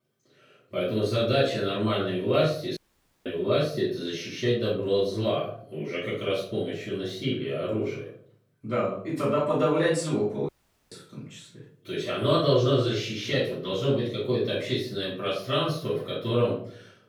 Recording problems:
off-mic speech; far
room echo; noticeable; dies away in 0.5 s
audio cutting out; at 3 s and at 10 s

